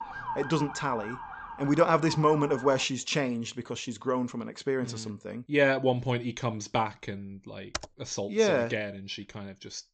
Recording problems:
high frequencies cut off; noticeable; nothing above 8 kHz
siren; noticeable; until 3 s; peak 8 dB below the speech
keyboard typing; noticeable; at 7.5 s; peak 9 dB below the speech

